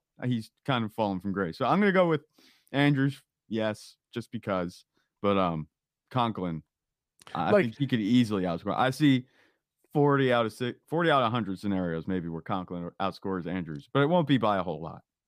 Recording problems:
none

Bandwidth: 15 kHz